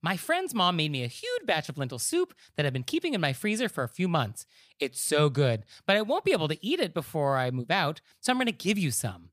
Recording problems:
none

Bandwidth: 15 kHz